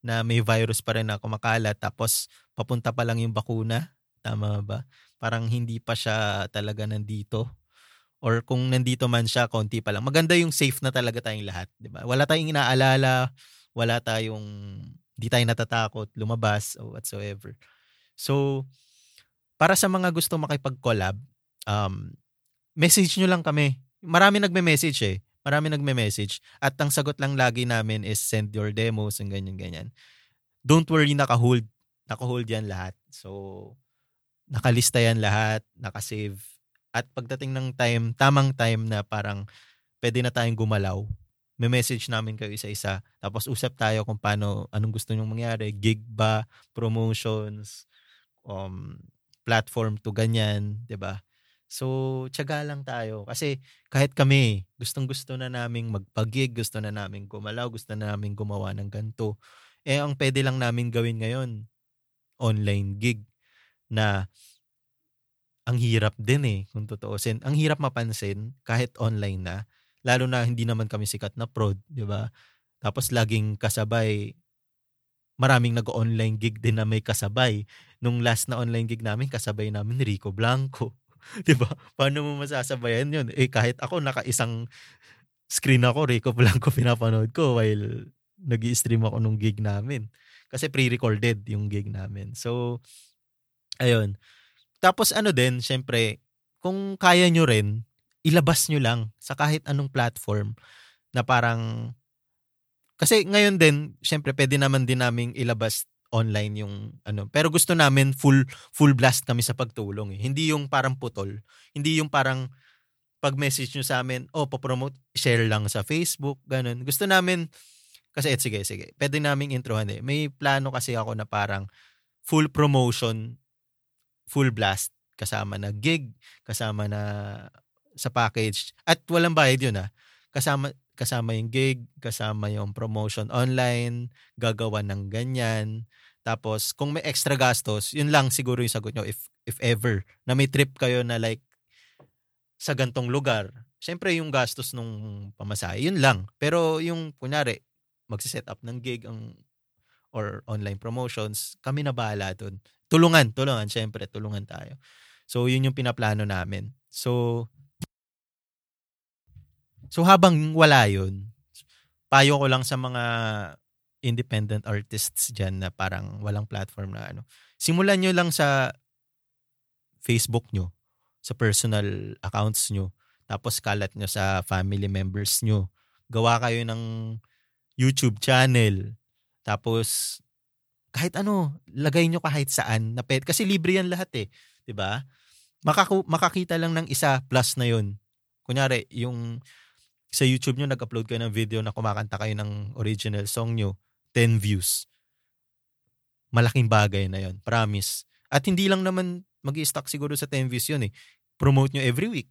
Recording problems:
none

